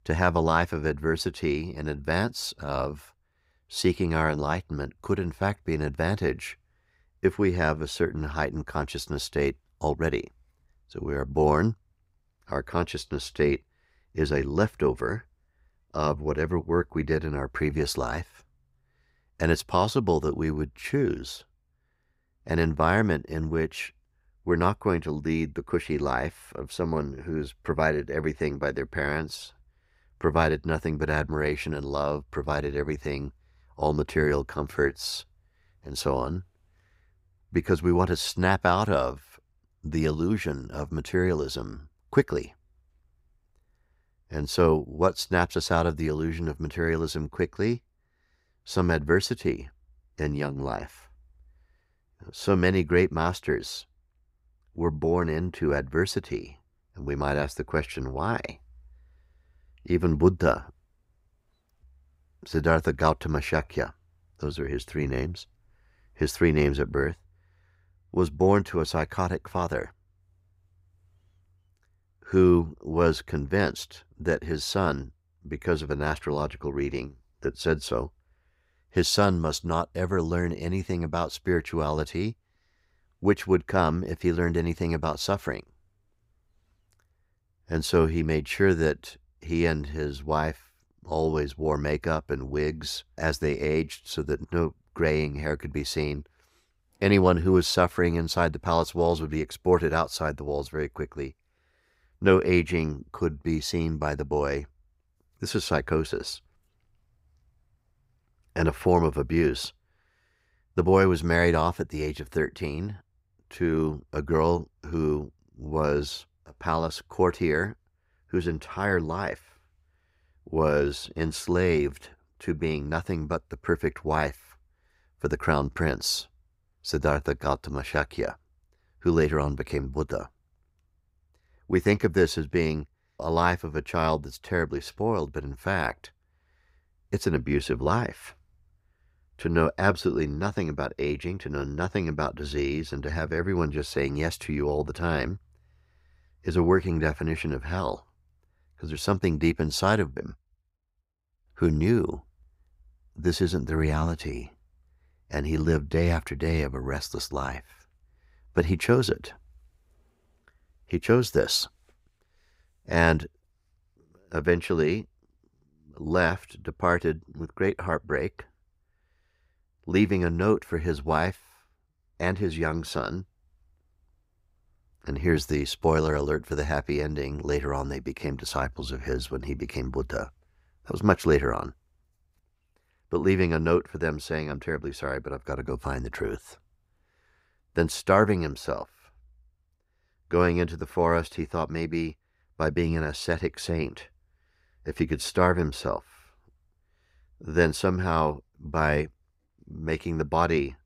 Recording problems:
none

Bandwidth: 15.5 kHz